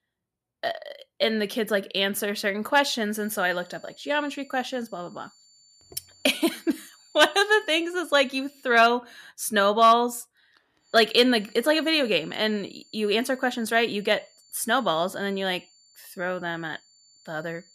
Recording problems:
high-pitched whine; faint; from 3 to 9 s and from 11 s on; 4.5 kHz, 30 dB below the speech

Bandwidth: 14.5 kHz